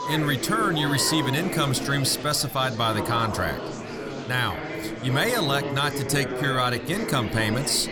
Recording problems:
murmuring crowd; loud; throughout; 7 dB below the speech

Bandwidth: 18.5 kHz